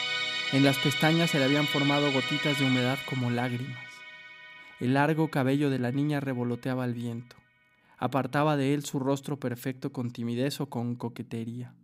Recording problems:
background music; loud; throughout; 1 dB below the speech

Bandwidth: 15.5 kHz